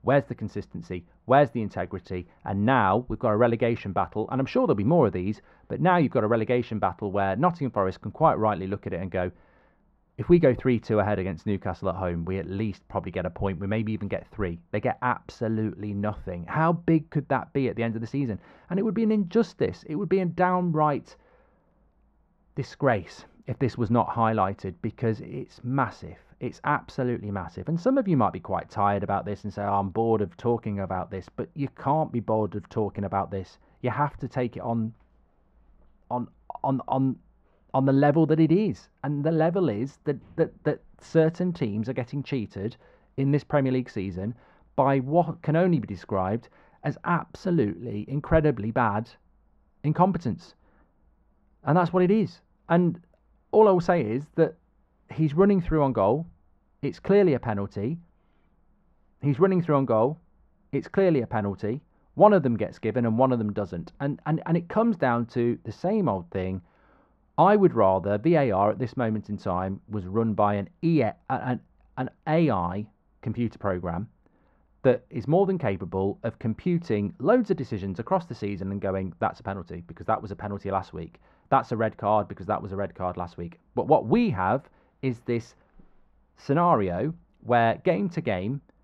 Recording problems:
muffled; very; fading above 3 kHz

